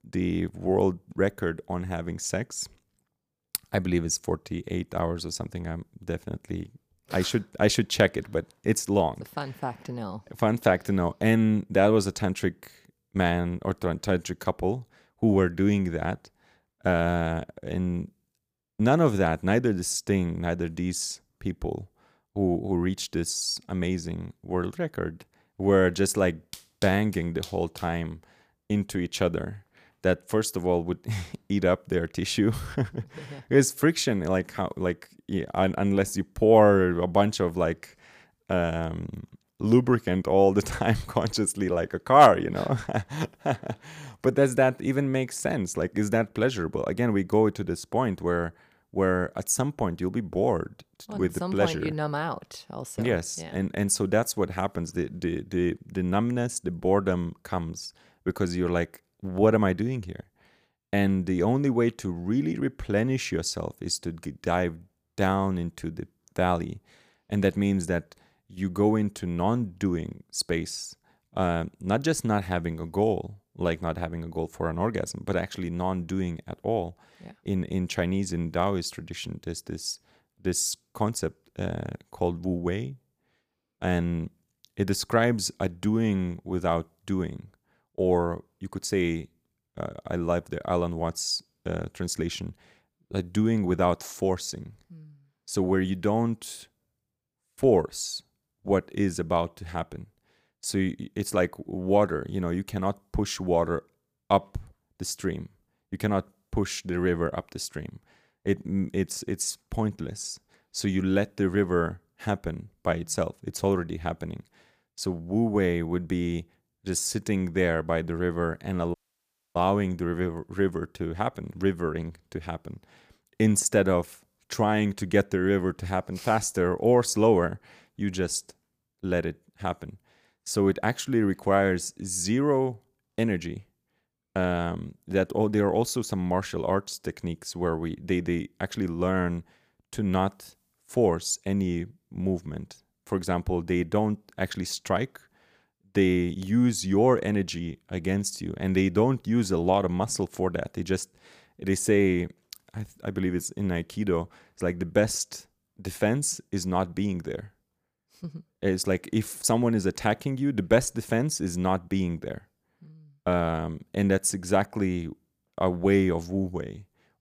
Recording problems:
audio cutting out; at 1:59 for 0.5 s

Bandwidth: 15 kHz